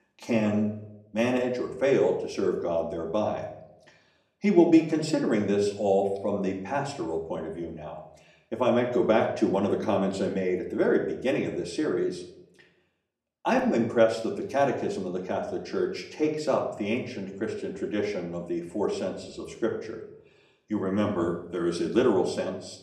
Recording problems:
off-mic speech; far
room echo; slight; dies away in 0.6 s

